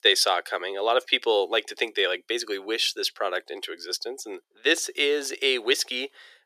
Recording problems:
thin; very; fading below 400 Hz

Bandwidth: 14.5 kHz